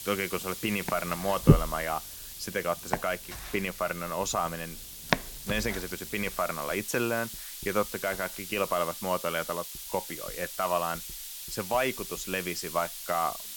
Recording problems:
household noises; very loud; throughout; 1 dB above the speech
hiss; loud; throughout; 7 dB below the speech

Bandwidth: 17 kHz